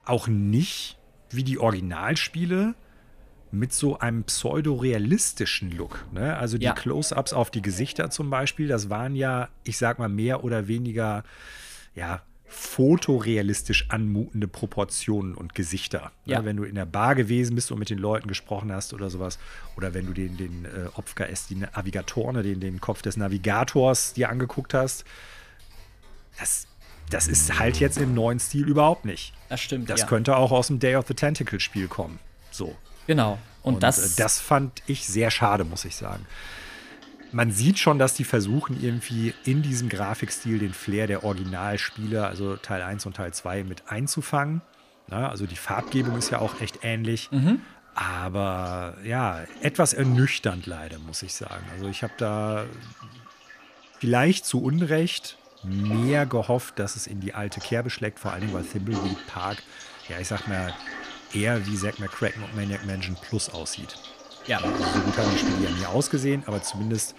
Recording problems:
household noises; noticeable; throughout; 10 dB below the speech
door banging; noticeable; from 27 to 28 s; peak 5 dB below the speech

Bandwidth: 14.5 kHz